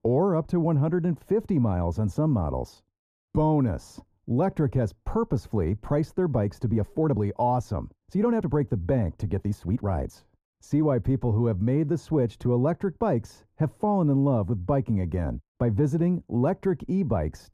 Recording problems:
muffled; very; fading above 1.5 kHz
uneven, jittery; strongly; from 3 to 10 s

